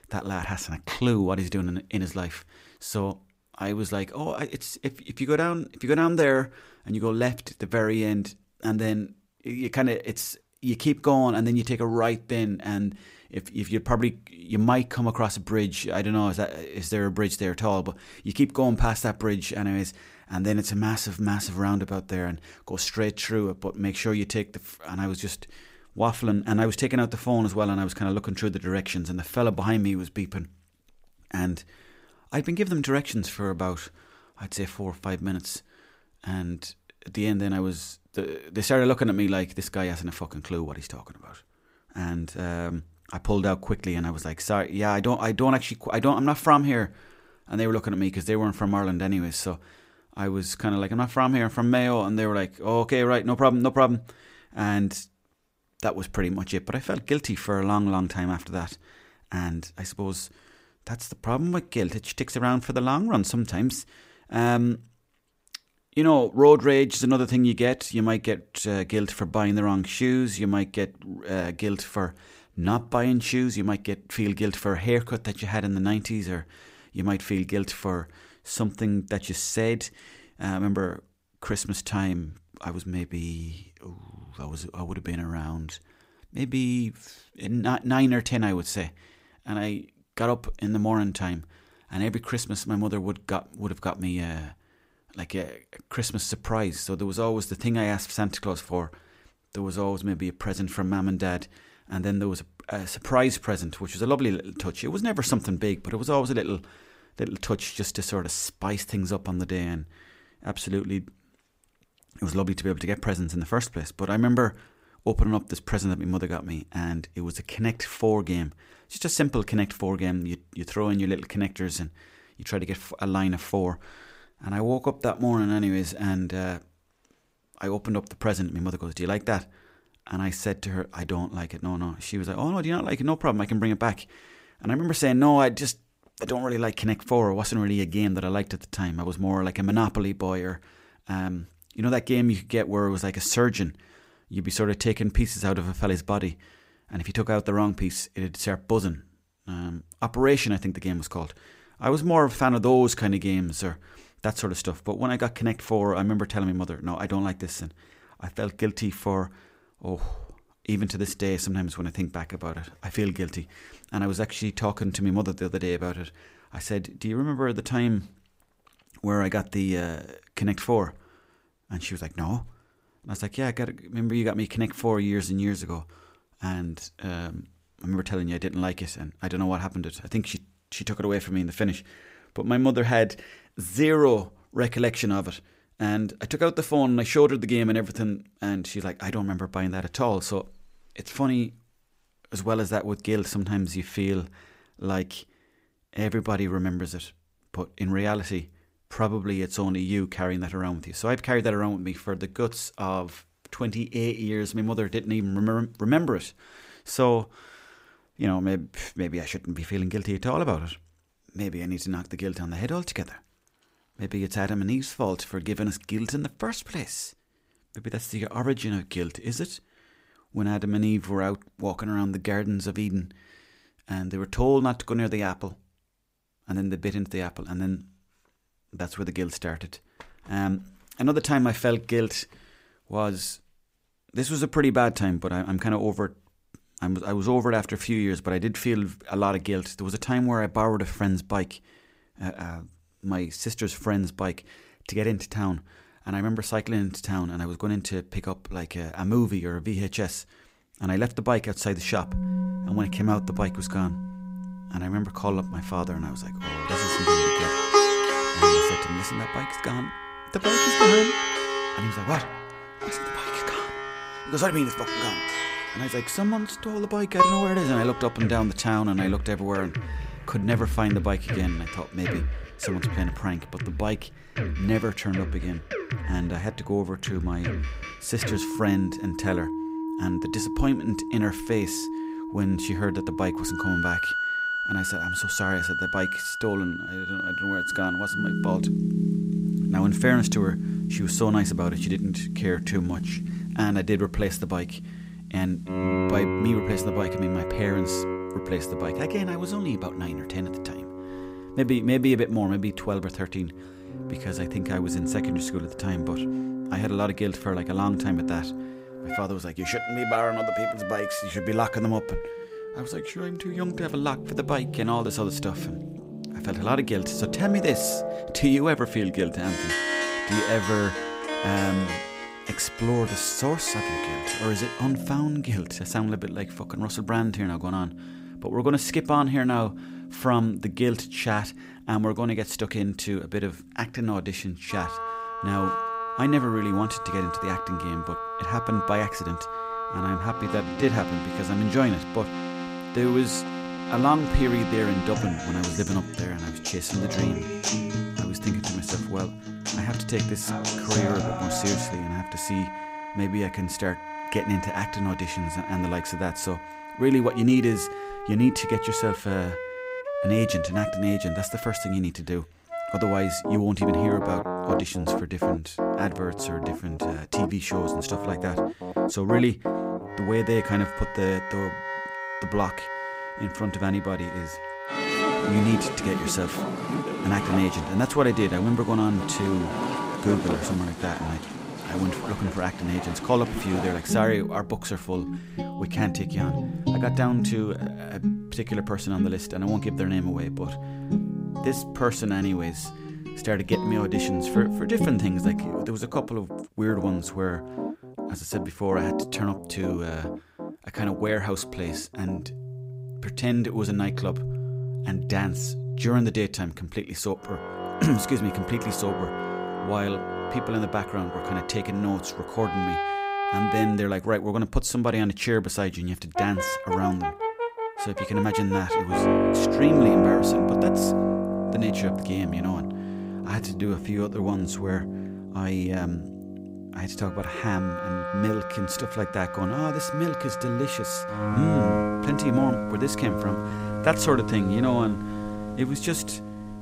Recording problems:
background music; loud; from 4:12 on; 2 dB below the speech
uneven, jittery; strongly; from 42 s to 7:14

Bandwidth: 15.5 kHz